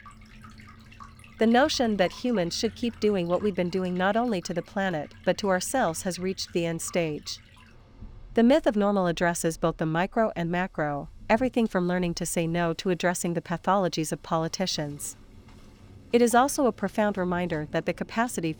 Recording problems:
rain or running water; faint; throughout; 25 dB below the speech

